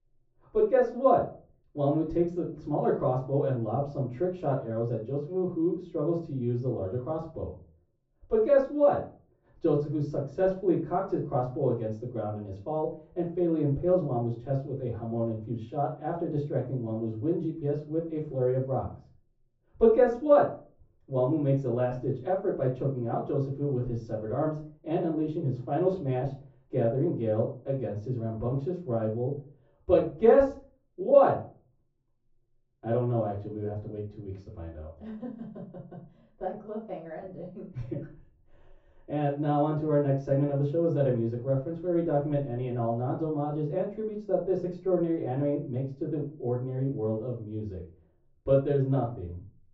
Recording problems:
off-mic speech; far
room echo; slight; dies away in 0.3 s
muffled; very slightly; fading above 1.5 kHz
high frequencies cut off; slight; nothing above 8 kHz

